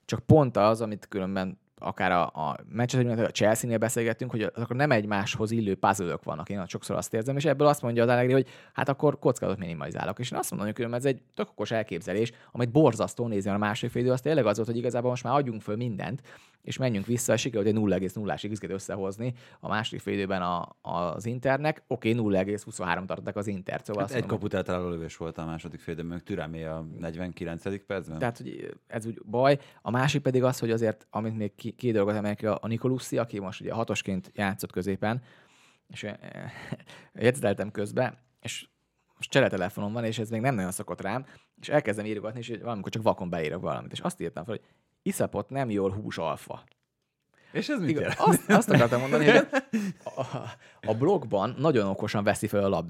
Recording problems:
abrupt cut into speech; at the end

